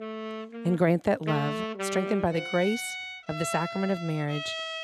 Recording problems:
background music; loud; throughout; 6 dB below the speech

